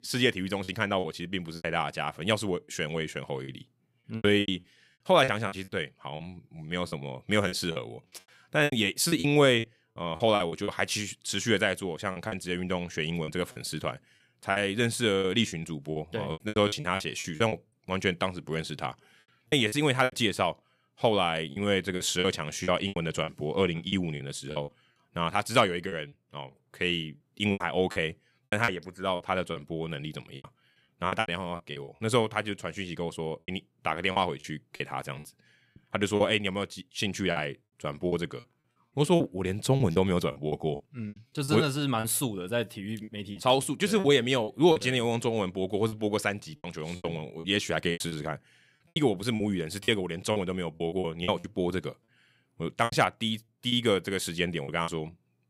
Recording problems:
choppy; very; 11% of the speech affected

